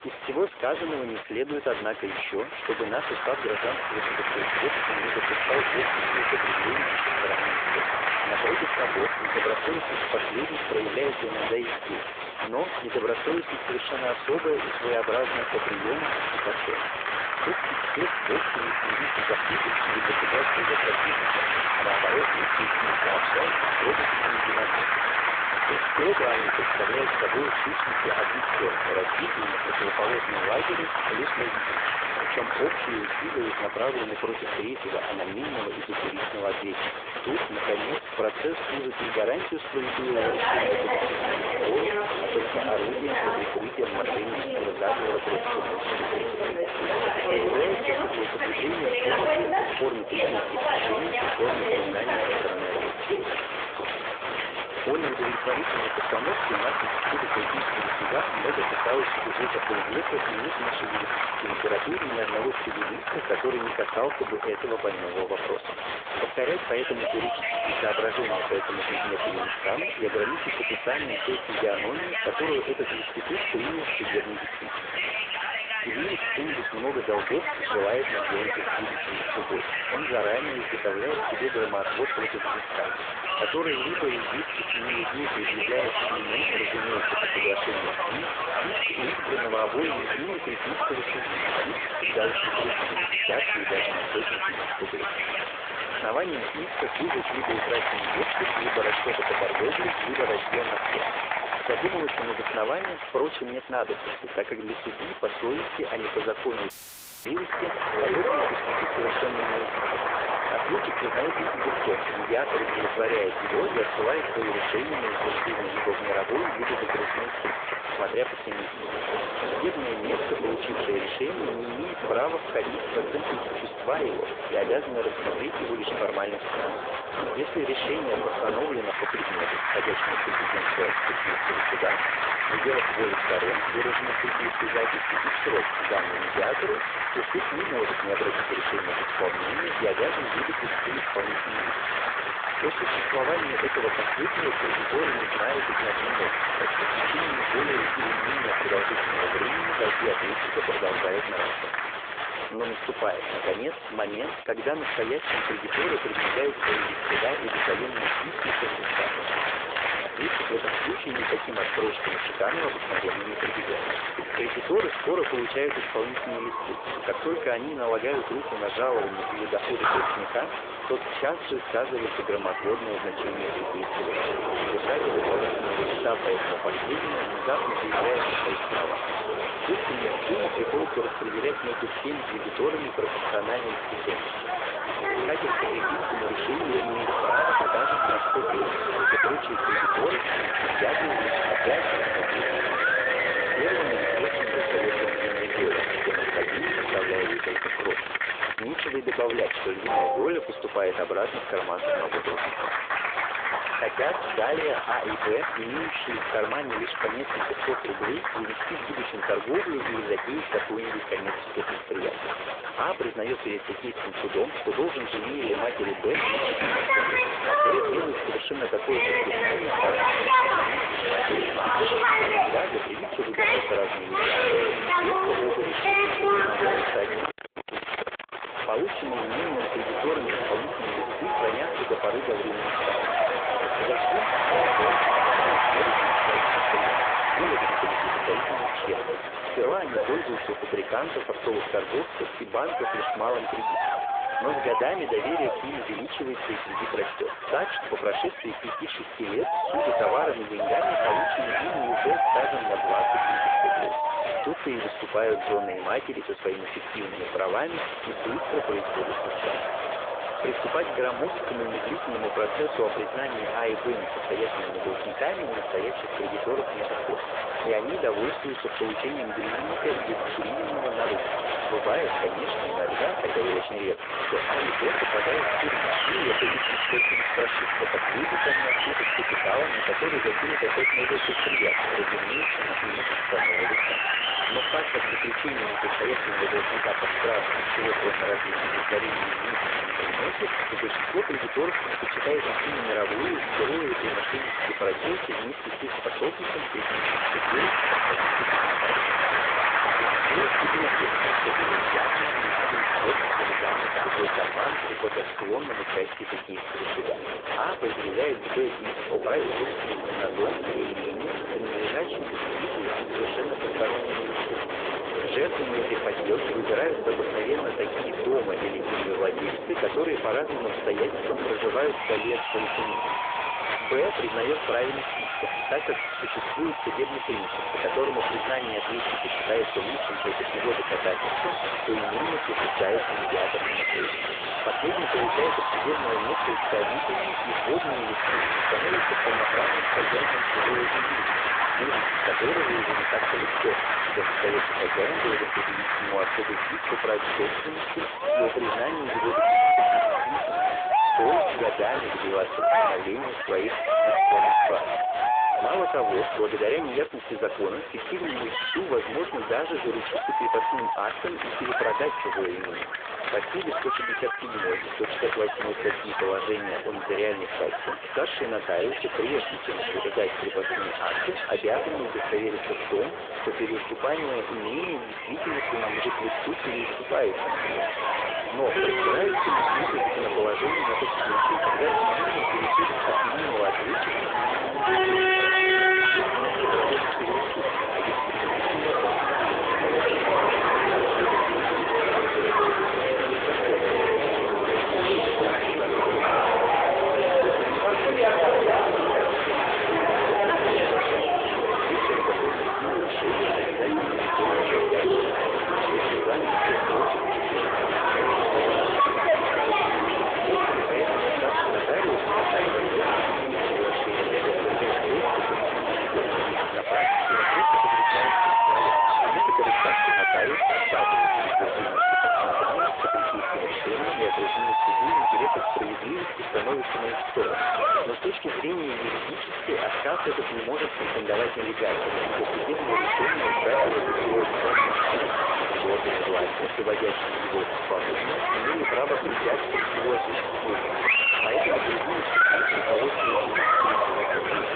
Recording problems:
phone-call audio
distortion; slight; 6 dB below the speech
crowd noise; very loud; throughout; 4 dB above the speech
audio cutting out; filled with static; at 1:47 for 0.5 s

